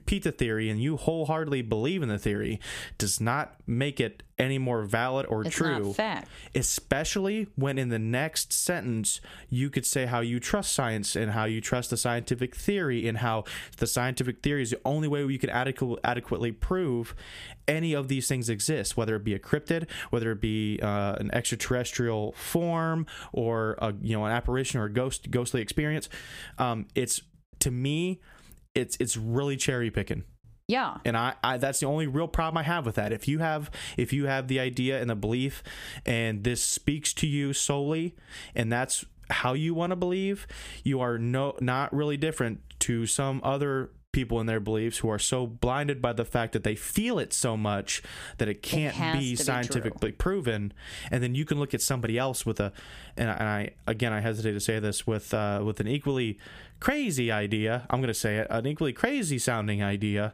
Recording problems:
squashed, flat; somewhat

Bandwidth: 15 kHz